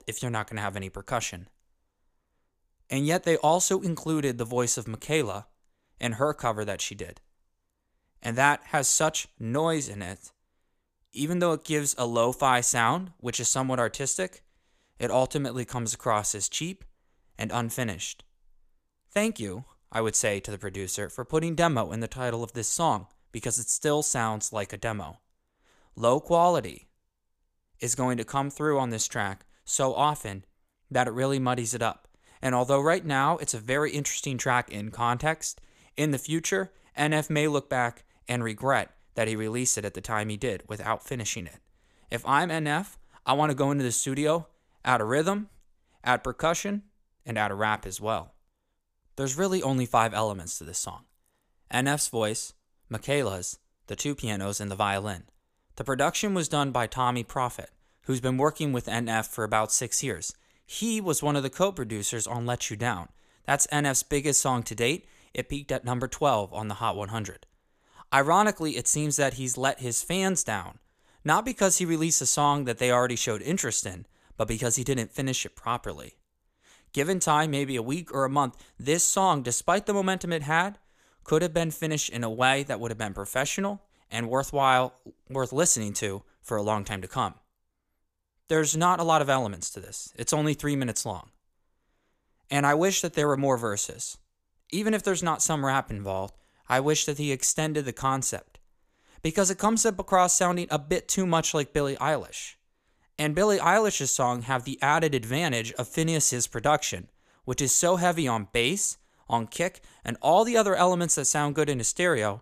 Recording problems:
none

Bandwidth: 14.5 kHz